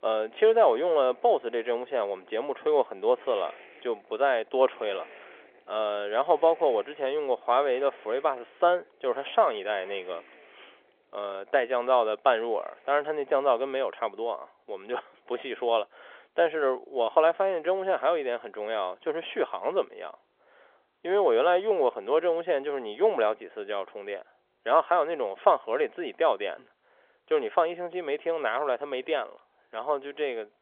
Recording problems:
phone-call audio; nothing above 3.5 kHz
traffic noise; faint; throughout; 25 dB below the speech

